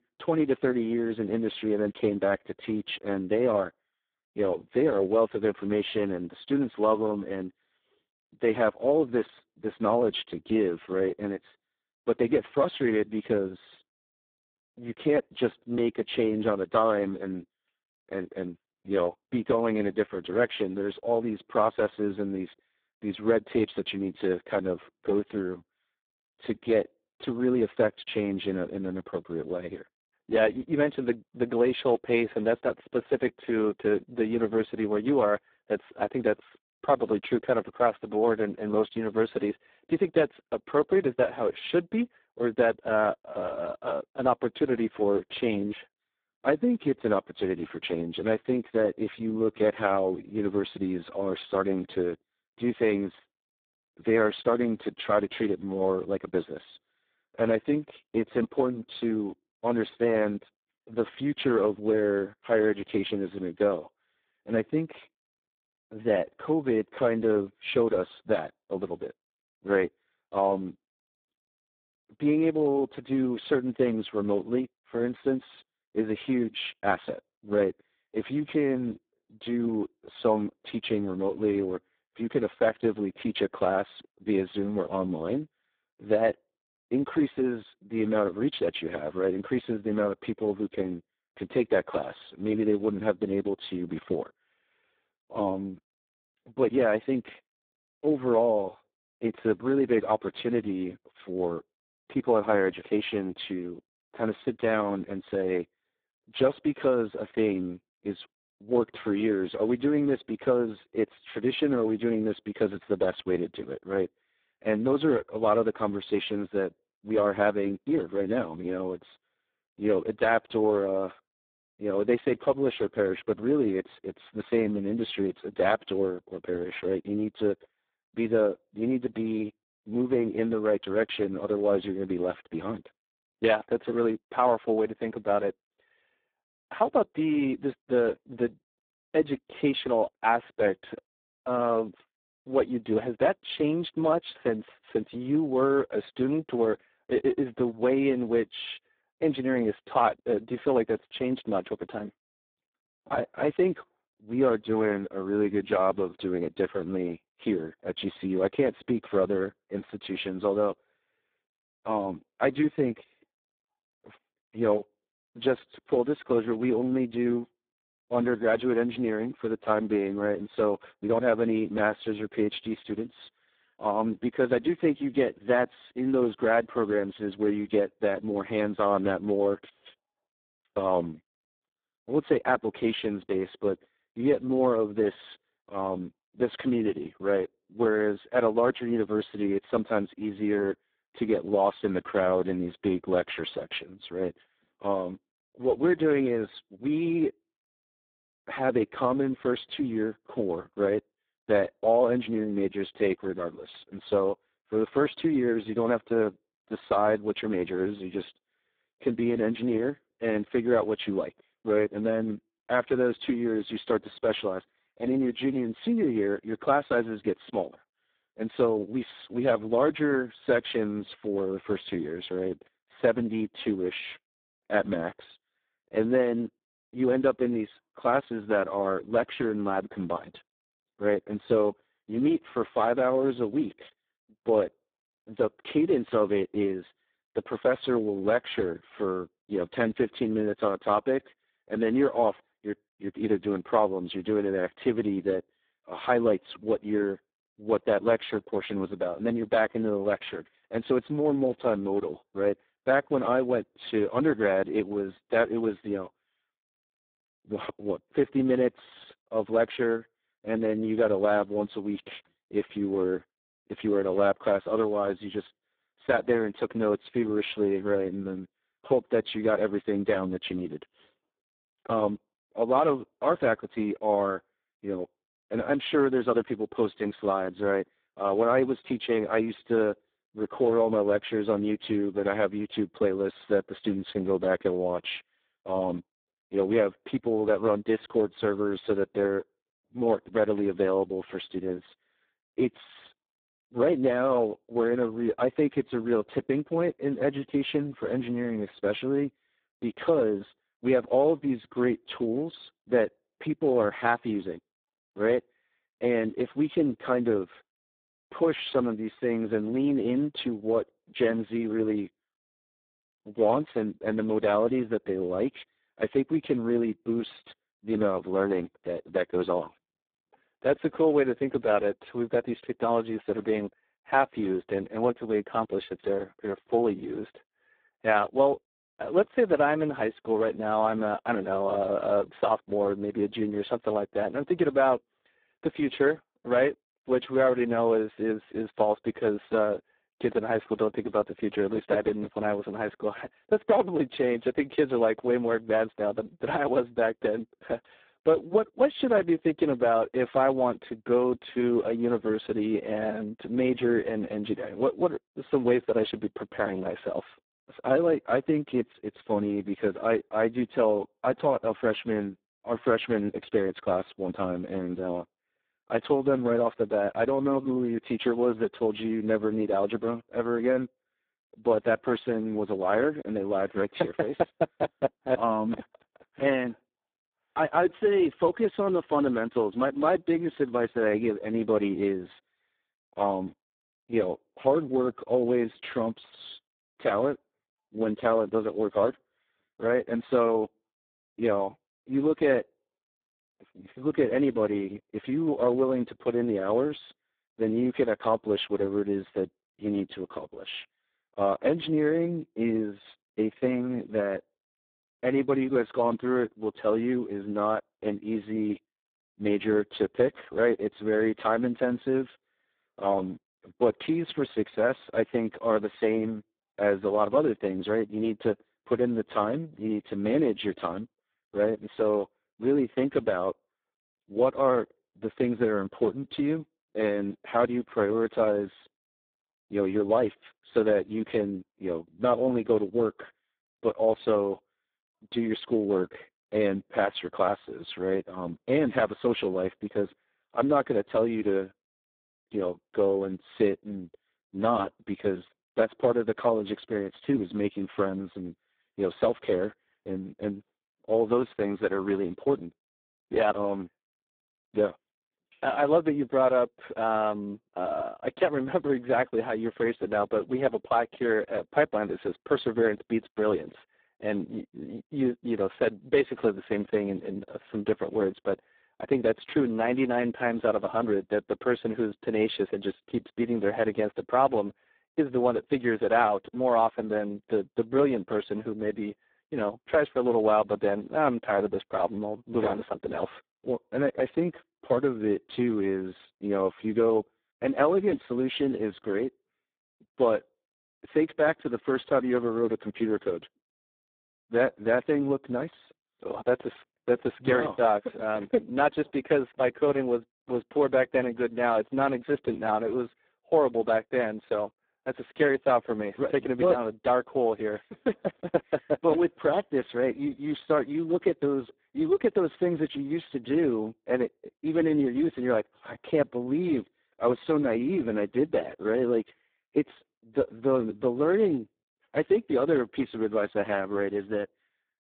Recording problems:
phone-call audio; poor line; nothing above 3.5 kHz

